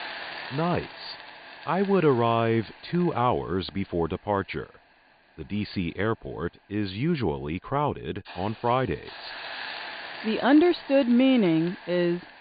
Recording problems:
high frequencies cut off; severe; nothing above 4.5 kHz
hiss; noticeable; throughout; 15 dB below the speech

